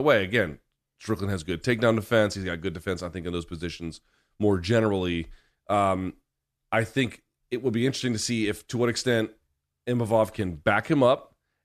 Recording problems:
abrupt cut into speech; at the start

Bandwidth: 14 kHz